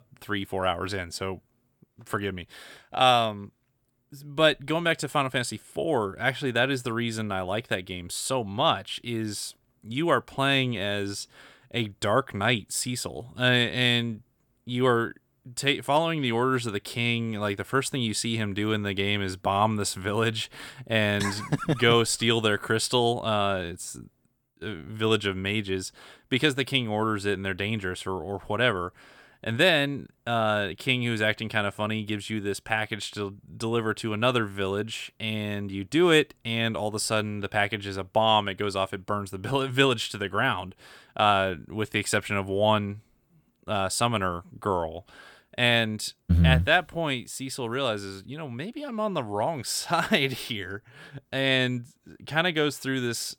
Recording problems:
none

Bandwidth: 18.5 kHz